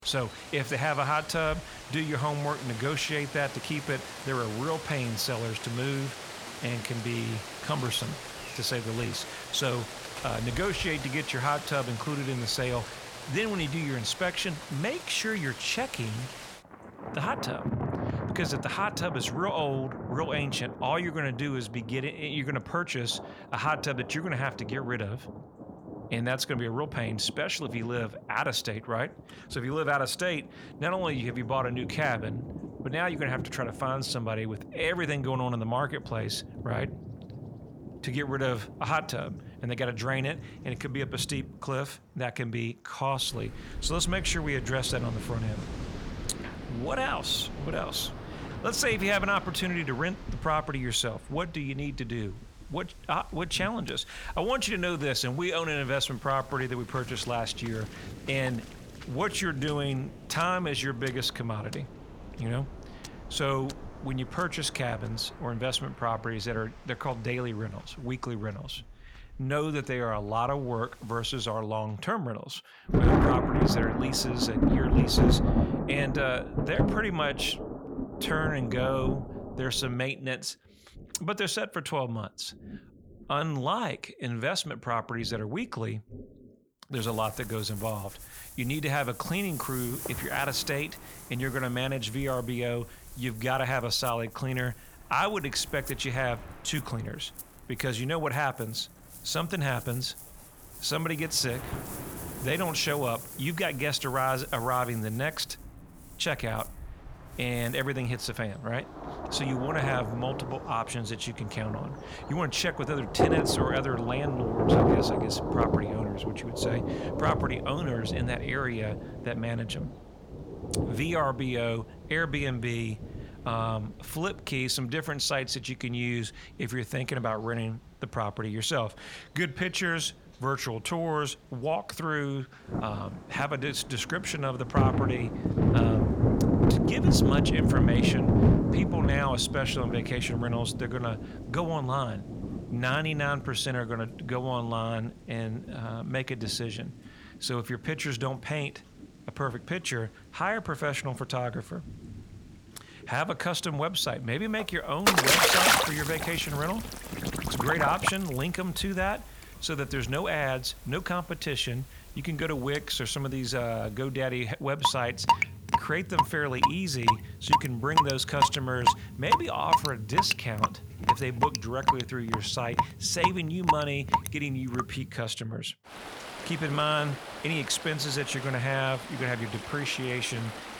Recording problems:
distortion; slight; 0.3% of the sound clipped
rain or running water; loud; throughout; 1 dB below the speech

